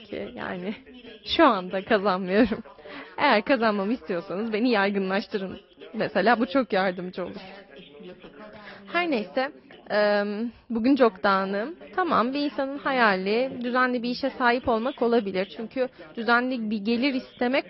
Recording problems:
high frequencies cut off; noticeable; nothing above 5.5 kHz
garbled, watery; slightly
background chatter; faint; throughout; 2 voices, 20 dB below the speech

